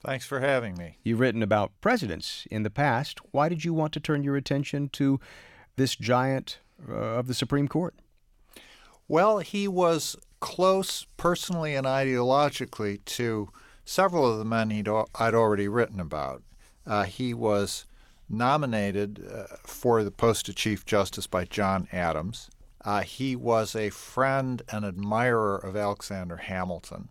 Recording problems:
none

